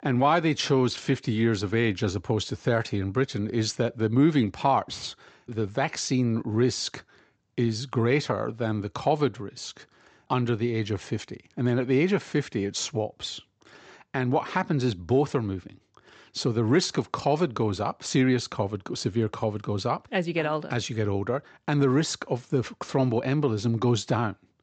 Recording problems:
high frequencies cut off; noticeable; nothing above 8 kHz

